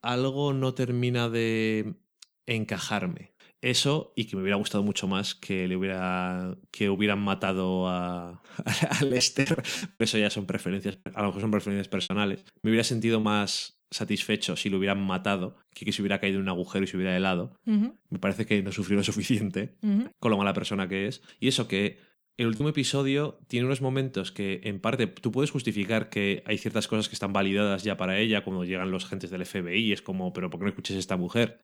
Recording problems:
choppy; very; from 9 to 13 s and at 23 s; 12% of the speech affected

